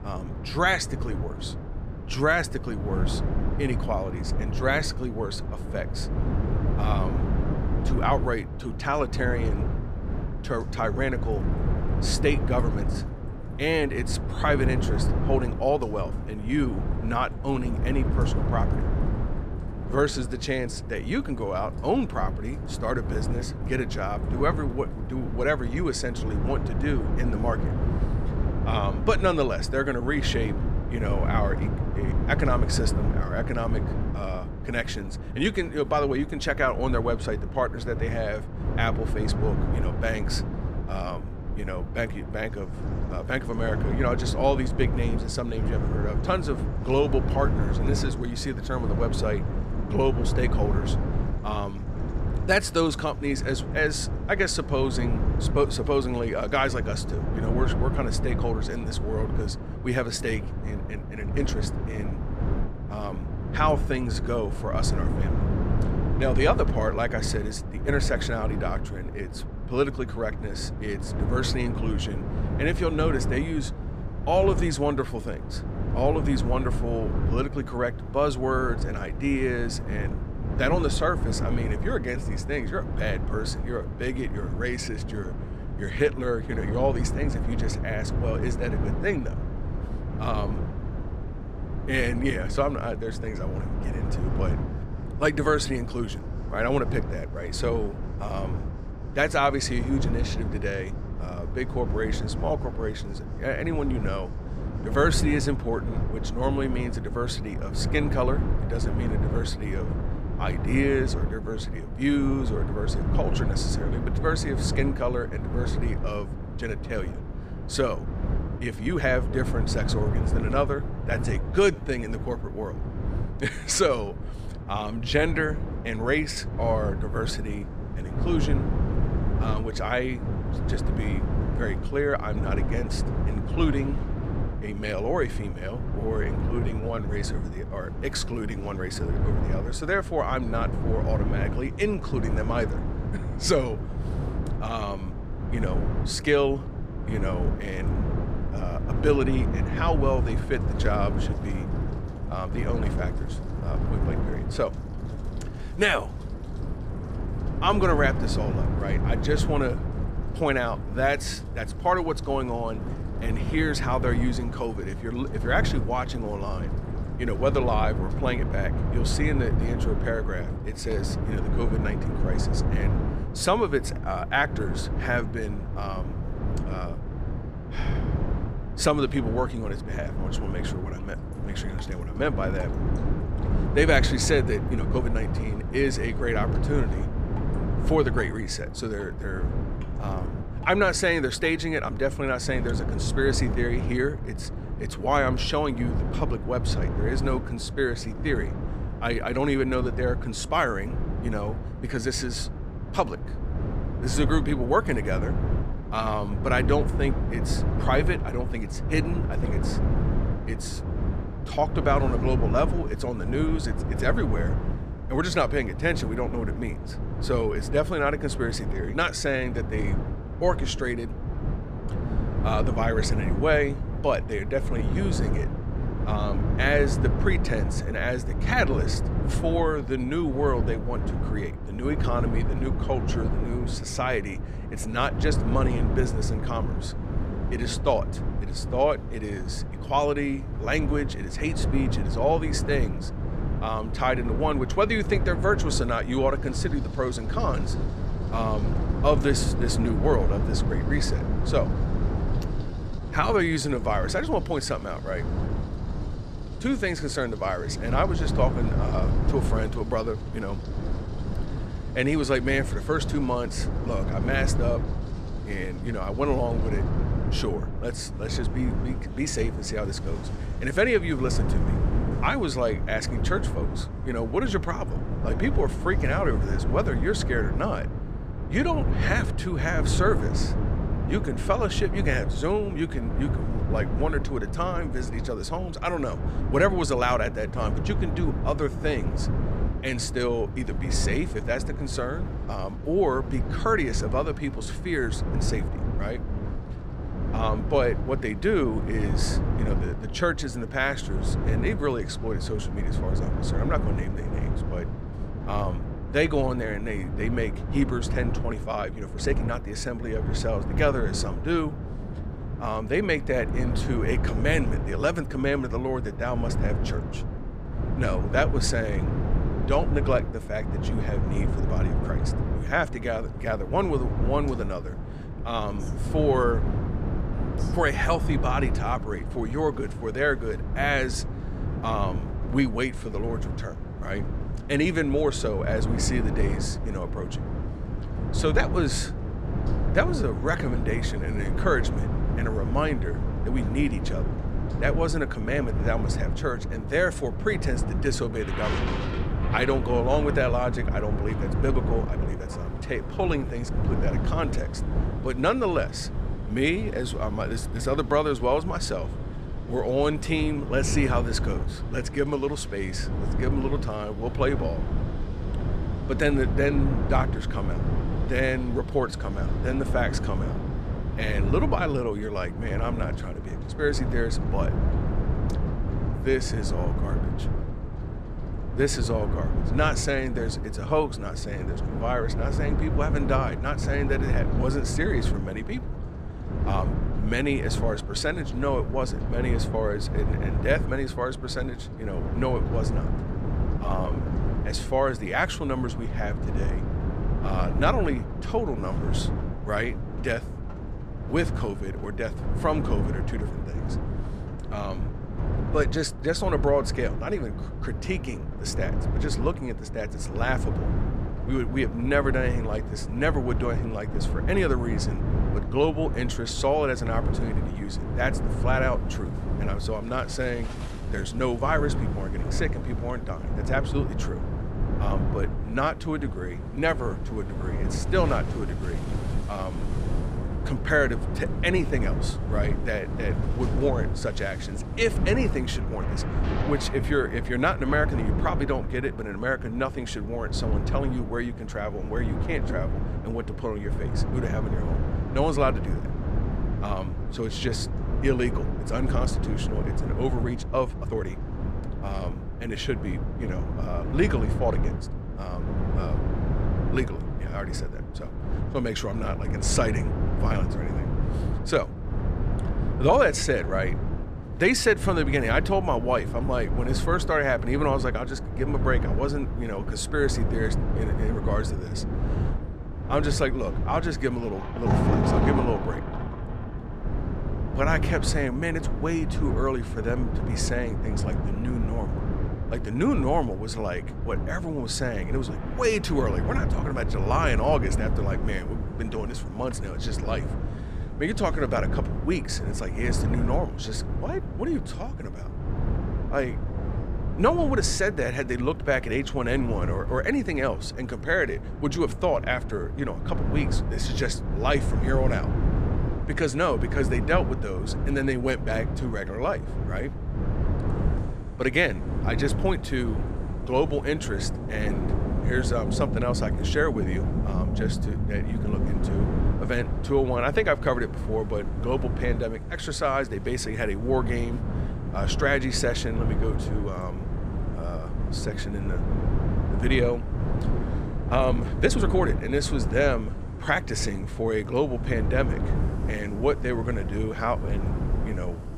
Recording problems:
wind noise on the microphone; heavy; 10 dB below the speech
rain or running water; noticeable; throughout; 10 dB below the speech
uneven, jittery; strongly; from 1:01 to 8:52

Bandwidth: 14.5 kHz